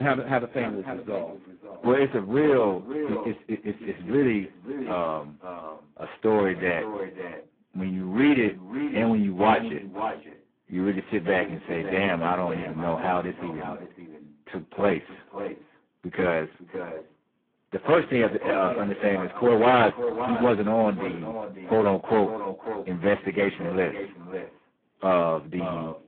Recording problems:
phone-call audio; poor line
echo of what is said; strong; throughout; 550 ms later, 10 dB below the speech
garbled, watery; badly
distortion; slight; 2% of the sound clipped
abrupt cut into speech; at the start

